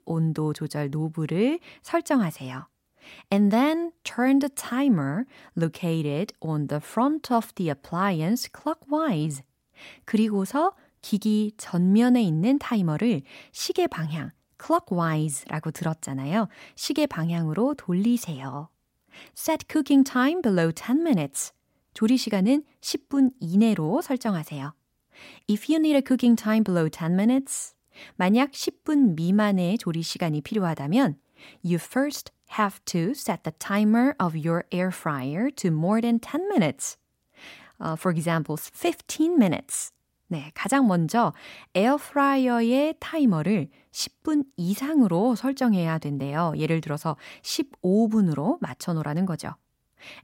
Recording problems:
none

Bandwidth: 16 kHz